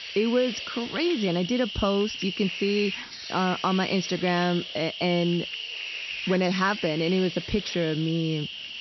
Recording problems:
high frequencies cut off; noticeable; nothing above 6 kHz
hiss; loud; throughout; 7 dB below the speech

